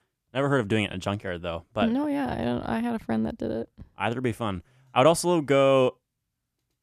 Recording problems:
none

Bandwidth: 14.5 kHz